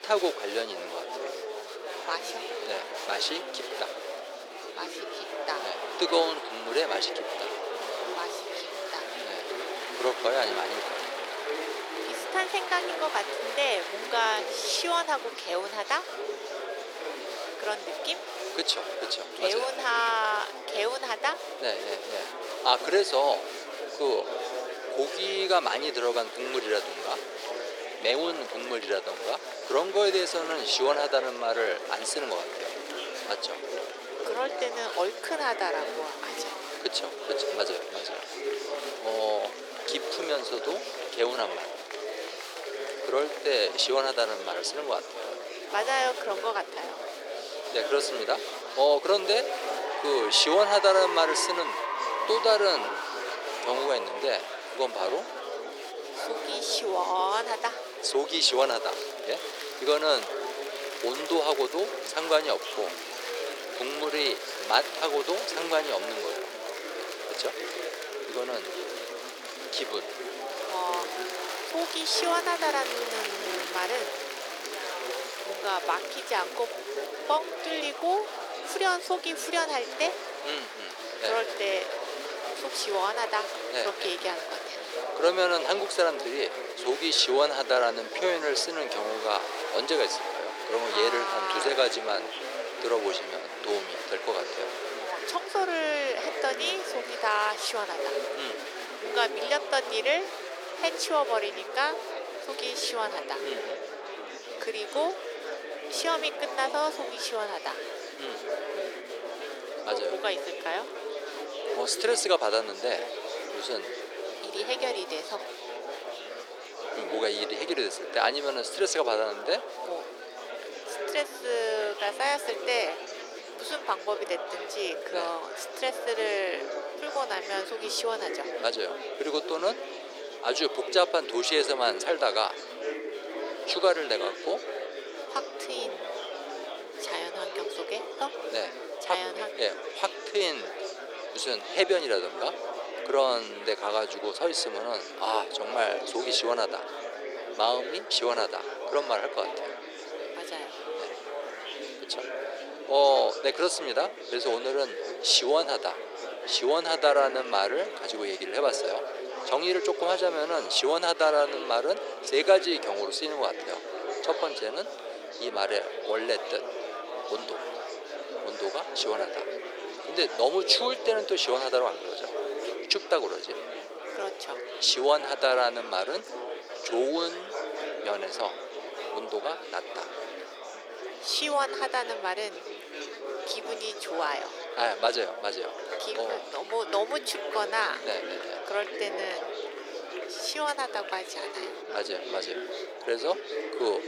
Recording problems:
thin; very; fading below 400 Hz
murmuring crowd; loud; throughout; 7 dB below the speech

